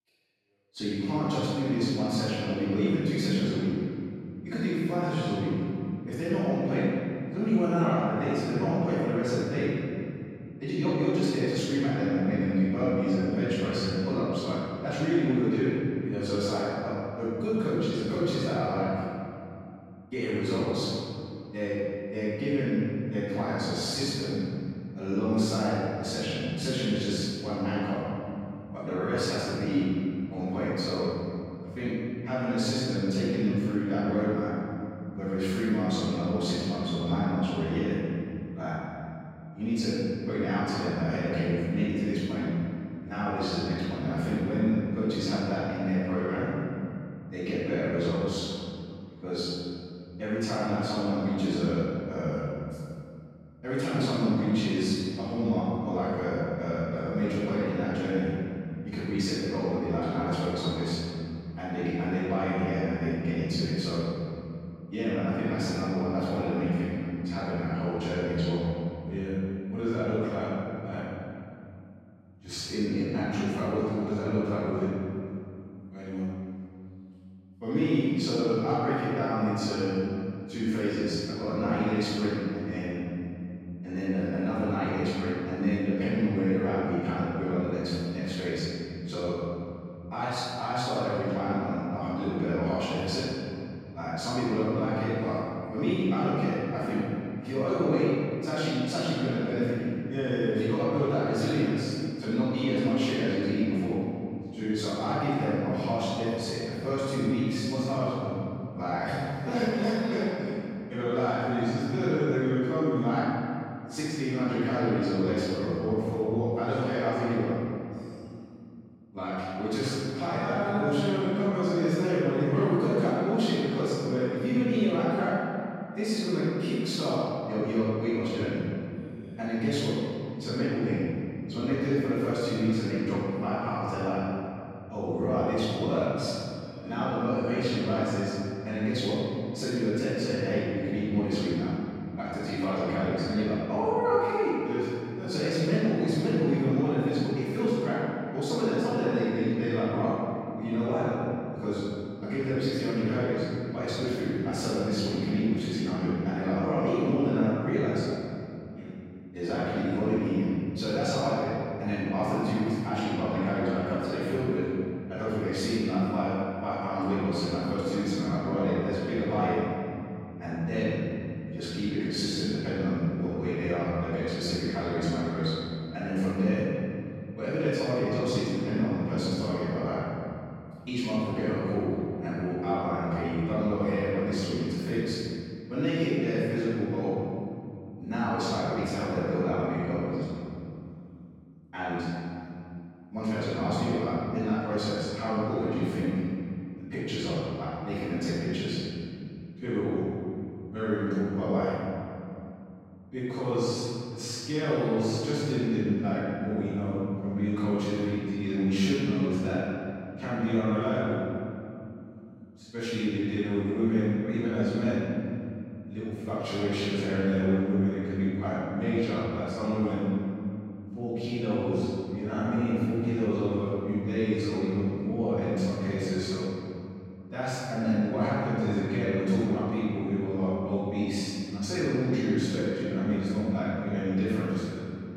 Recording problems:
room echo; strong; dies away in 2.6 s
off-mic speech; far

